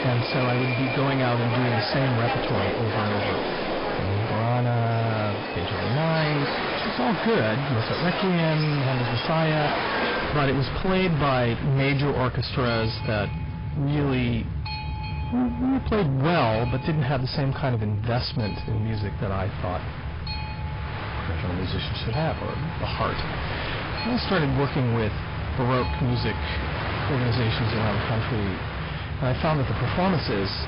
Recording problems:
distortion; heavy; 7 dB below the speech
garbled, watery; badly
high frequencies cut off; noticeable; nothing above 5 kHz
train or aircraft noise; loud; throughout; 4 dB below the speech

